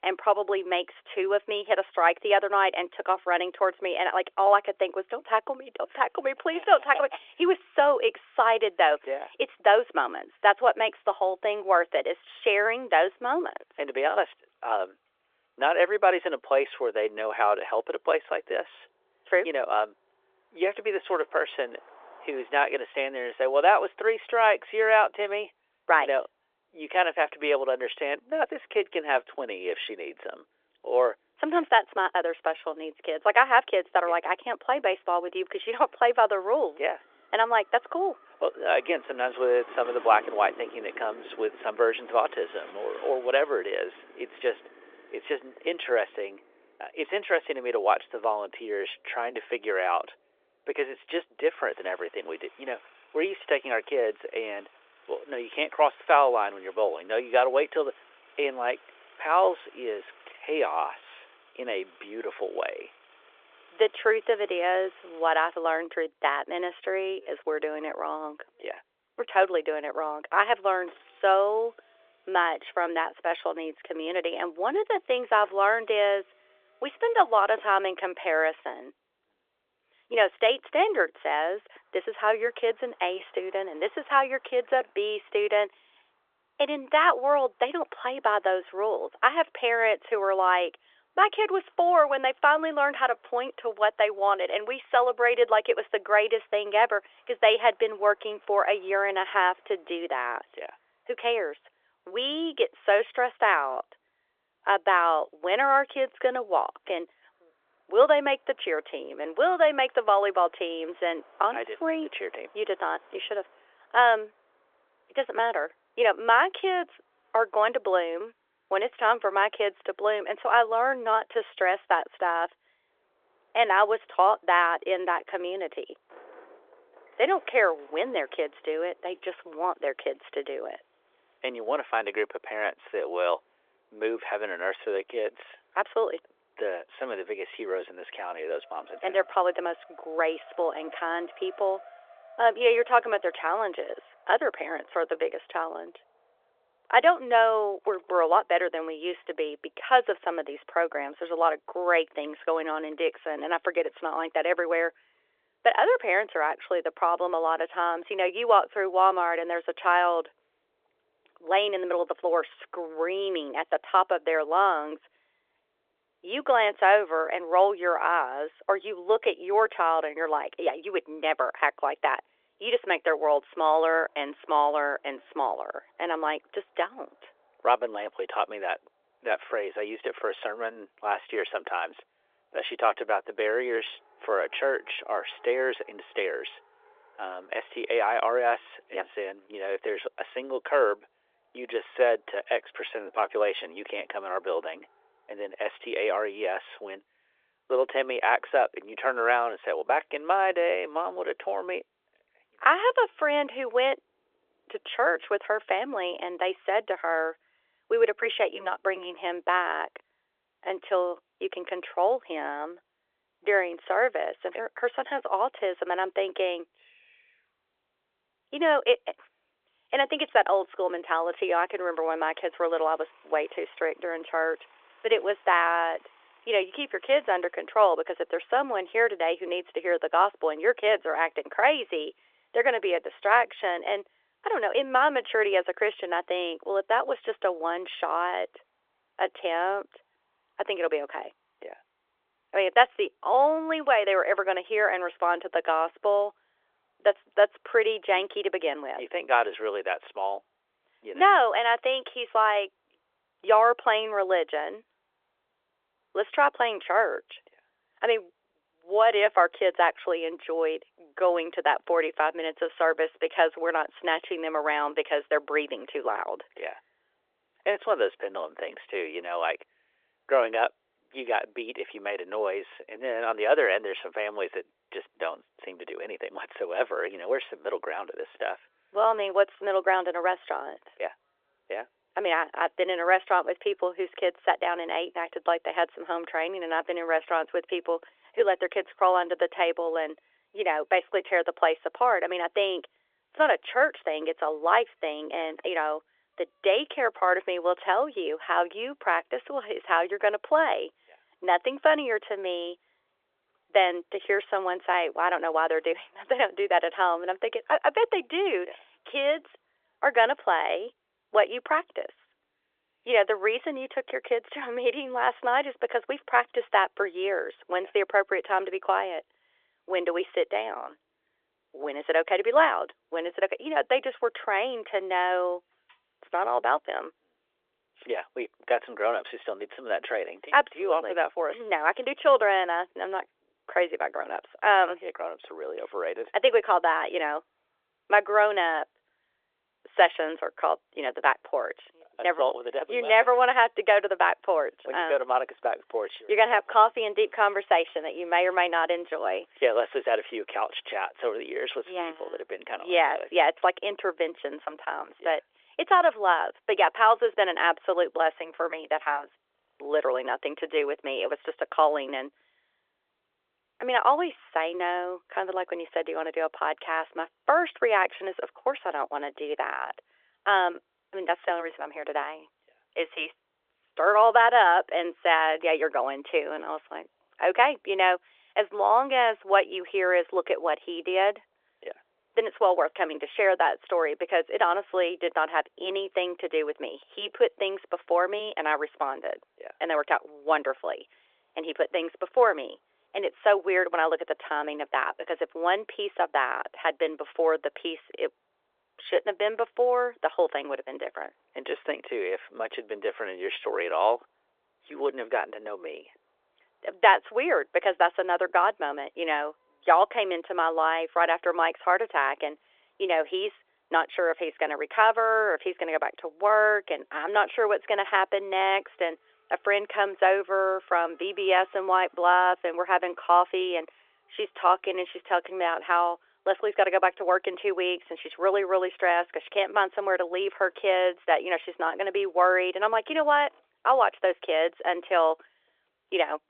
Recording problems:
phone-call audio; nothing above 3.5 kHz
traffic noise; faint; throughout; 30 dB below the speech

